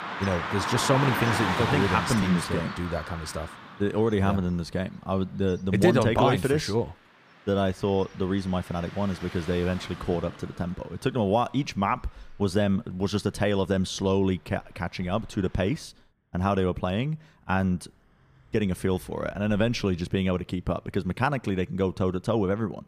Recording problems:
traffic noise; loud; throughout; 5 dB below the speech

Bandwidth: 15 kHz